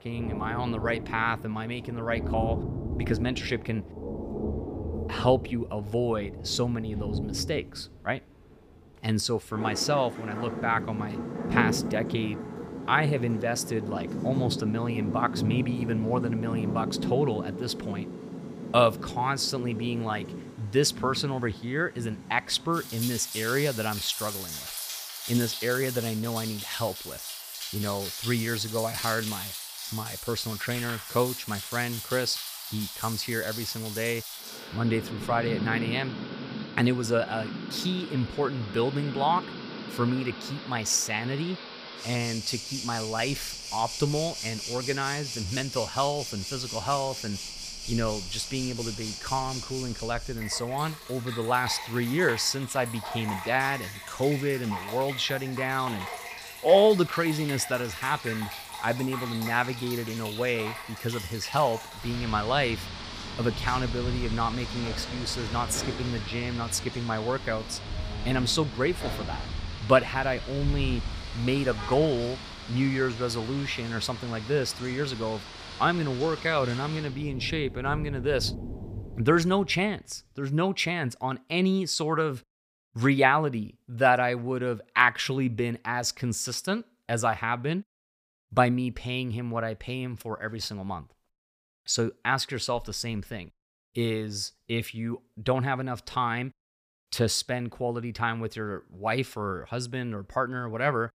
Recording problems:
rain or running water; loud; until 1:19; 7 dB below the speech

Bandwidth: 15 kHz